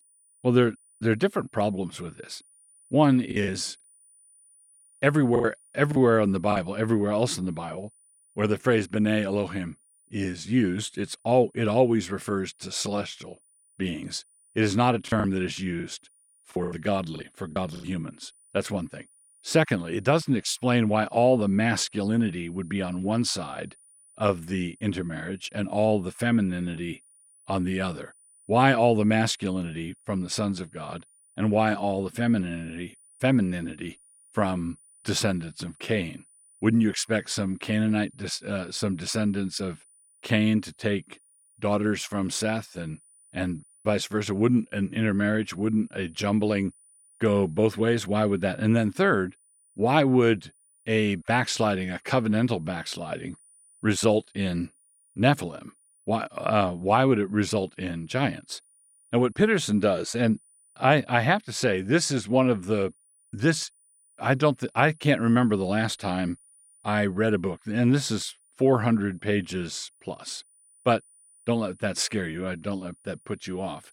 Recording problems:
high-pitched whine; faint; throughout; 9.5 kHz, 30 dB below the speech
choppy; very; from 3.5 to 6.5 s and from 15 to 18 s; 13% of the speech affected

